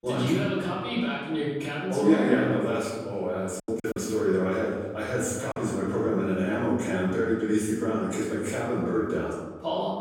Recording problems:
off-mic speech; far
room echo; noticeable; dies away in 1.1 s
choppy; very; from 3.5 to 5.5 s; 9% of the speech affected

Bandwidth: 16.5 kHz